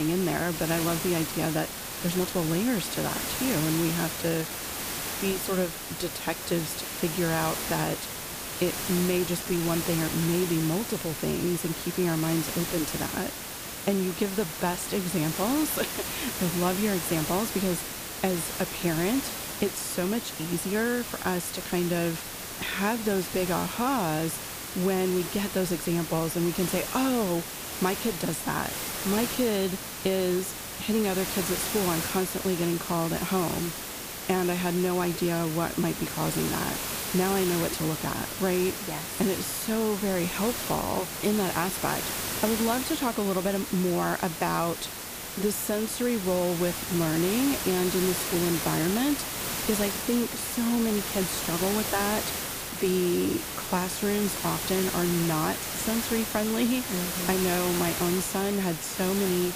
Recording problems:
hiss; loud; throughout; 3 dB below the speech
abrupt cut into speech; at the start
uneven, jittery; slightly; from 2 to 53 s

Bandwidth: 15 kHz